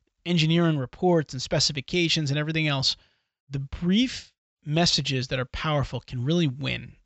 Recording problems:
high frequencies cut off; noticeable; nothing above 7.5 kHz

